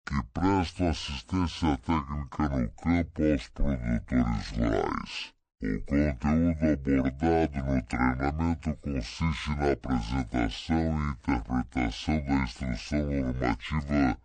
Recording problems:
wrong speed and pitch; too slow and too low; 0.6 times normal speed

